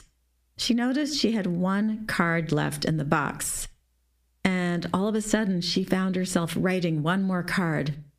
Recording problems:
squashed, flat; heavily

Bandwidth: 15 kHz